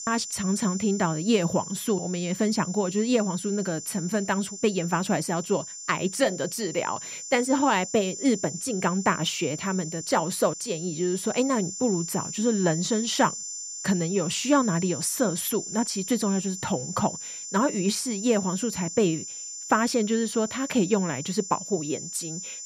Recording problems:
high-pitched whine; loud; throughout; 7 kHz, 8 dB below the speech

